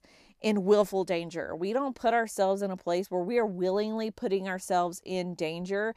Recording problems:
none

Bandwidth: 14.5 kHz